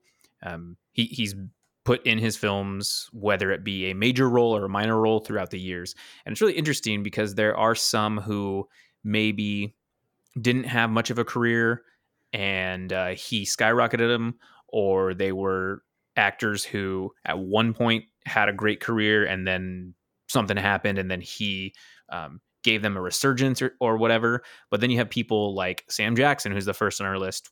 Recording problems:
none

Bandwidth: 18.5 kHz